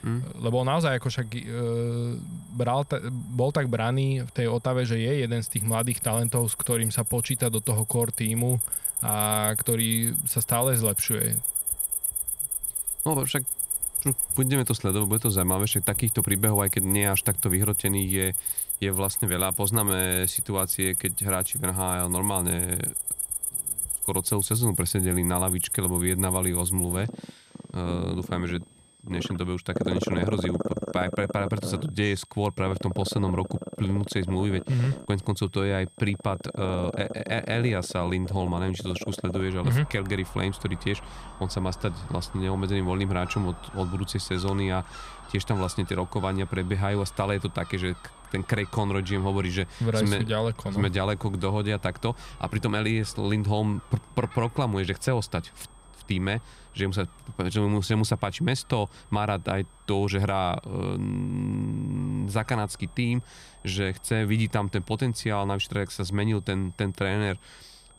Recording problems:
animal sounds; very loud; throughout; 1 dB above the speech
high-pitched whine; faint; throughout; 8.5 kHz, 30 dB below the speech

